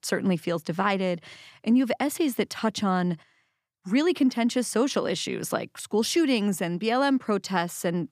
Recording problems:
none

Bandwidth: 15 kHz